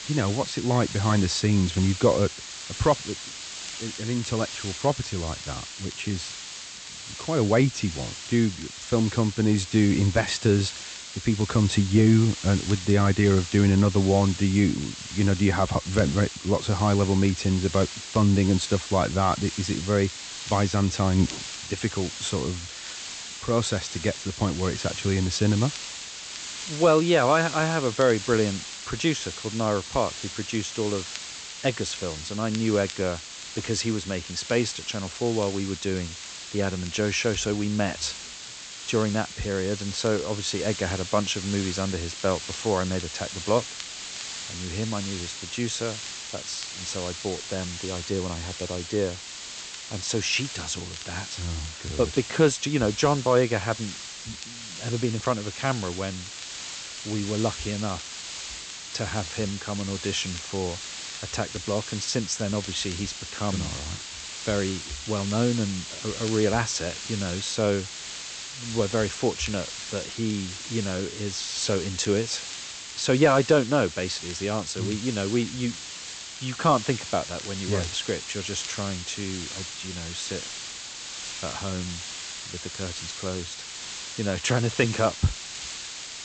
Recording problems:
high frequencies cut off; noticeable; nothing above 8 kHz
hiss; loud; throughout; 9 dB below the speech
crackle, like an old record; faint; 25 dB below the speech

